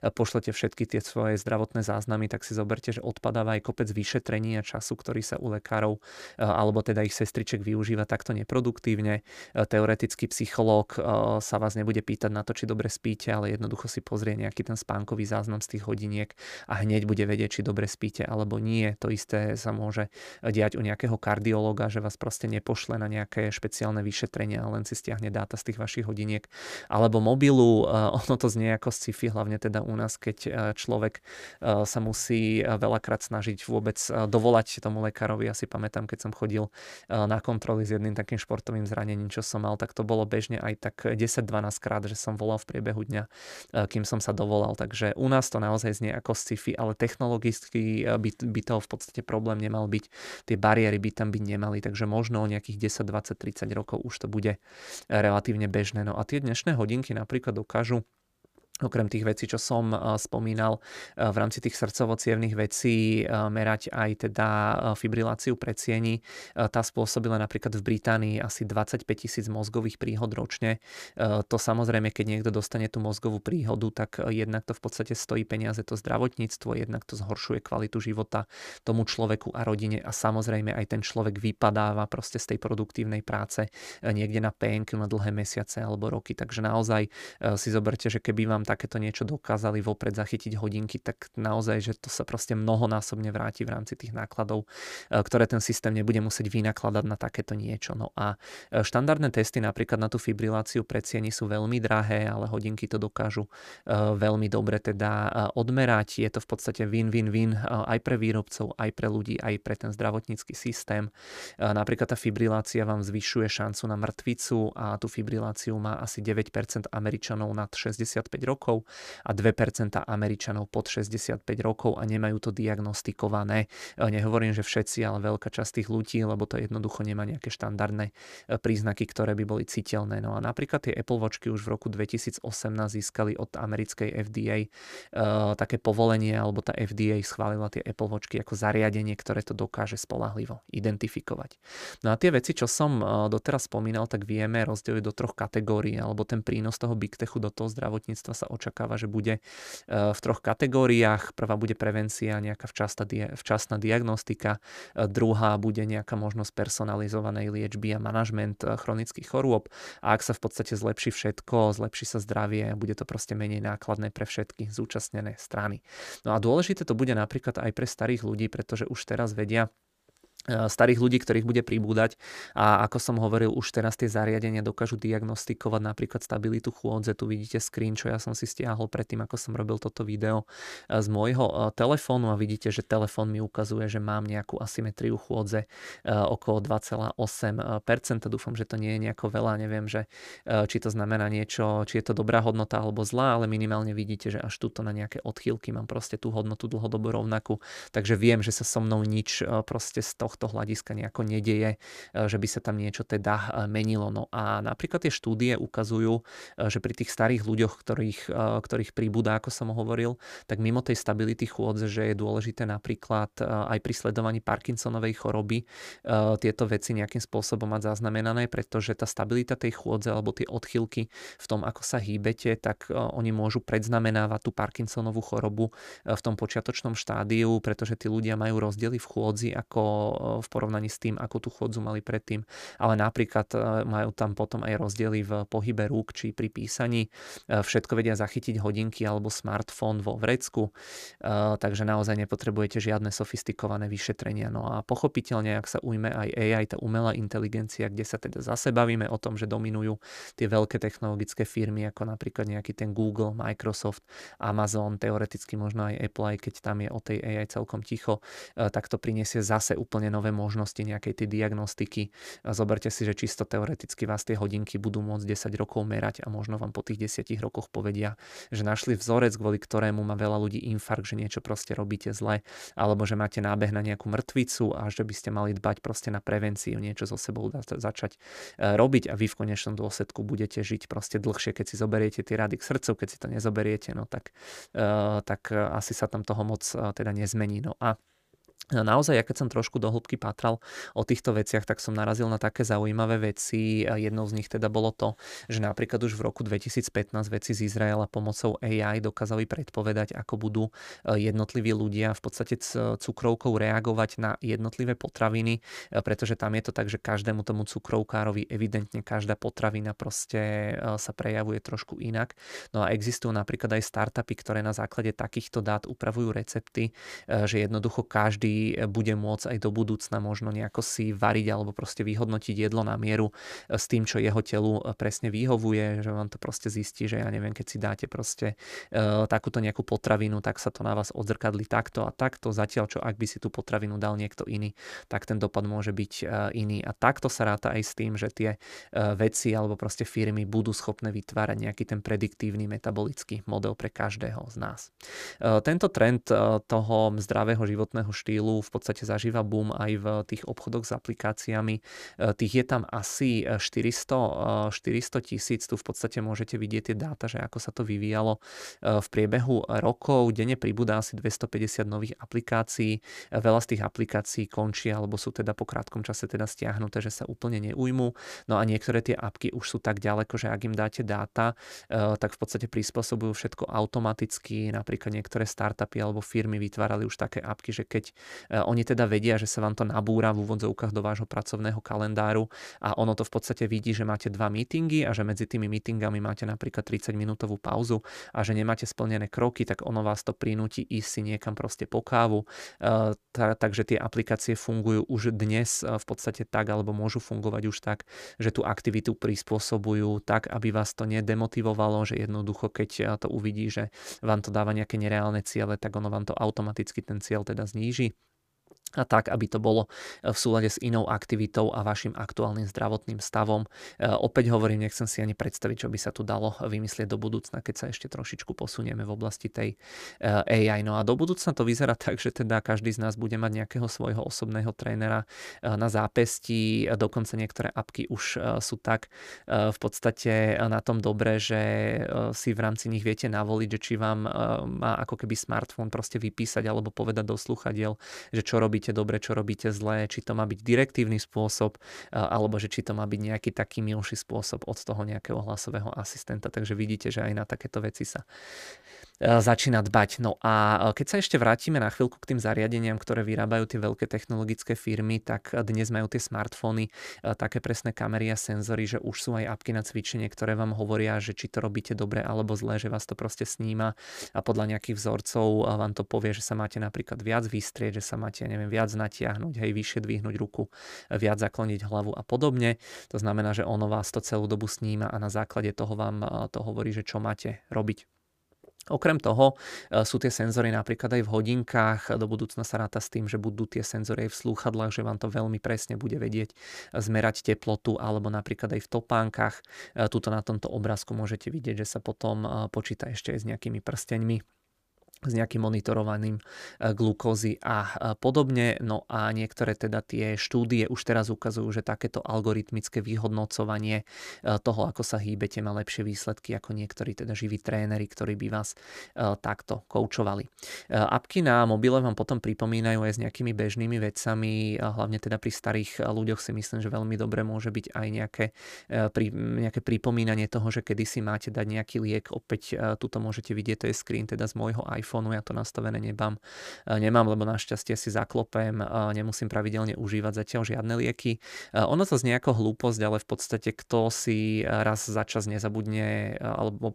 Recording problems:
none

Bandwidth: 15 kHz